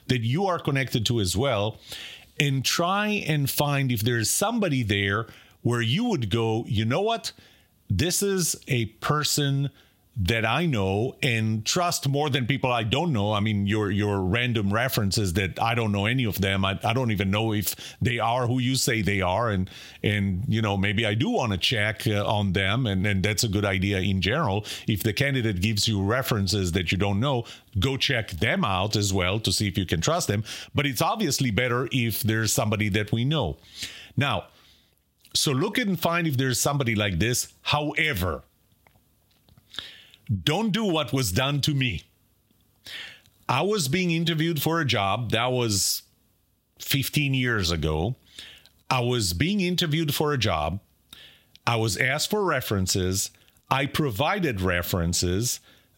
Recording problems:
squashed, flat; somewhat

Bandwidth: 16 kHz